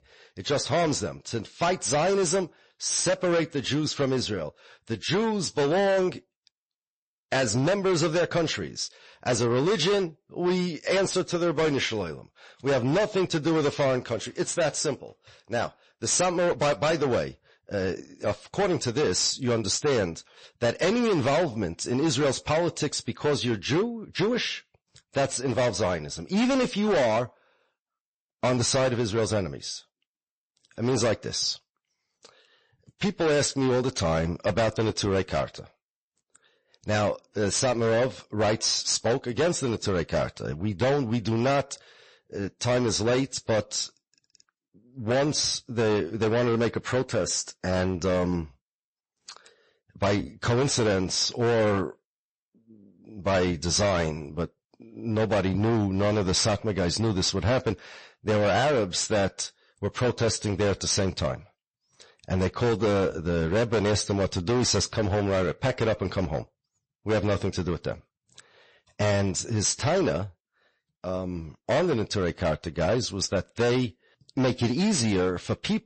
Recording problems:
distortion; heavy; 14% of the sound clipped
garbled, watery; slightly; nothing above 8 kHz

